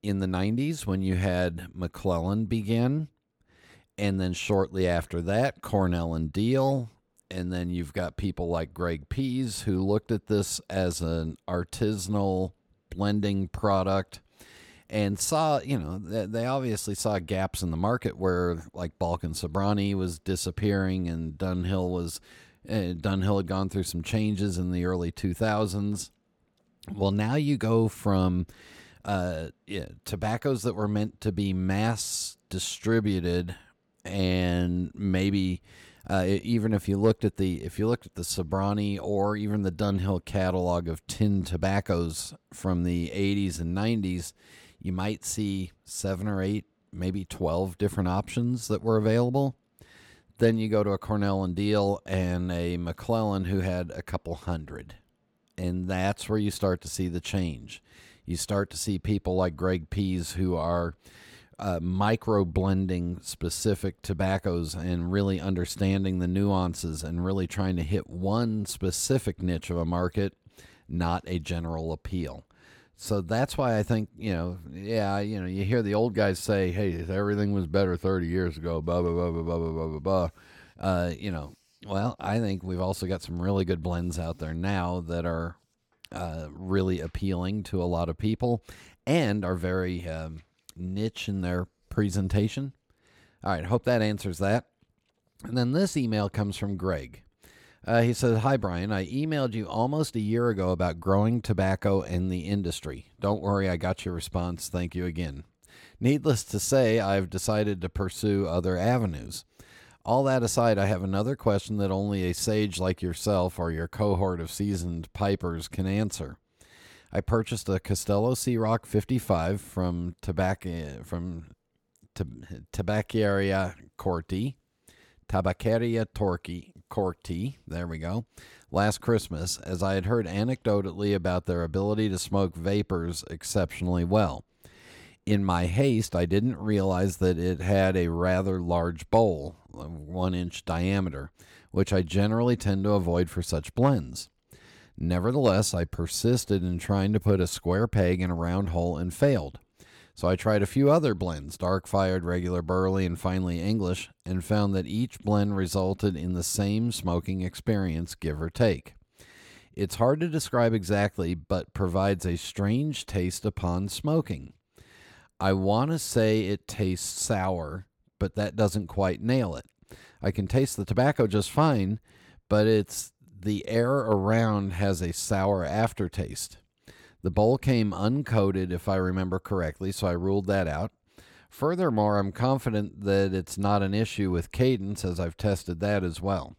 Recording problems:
none

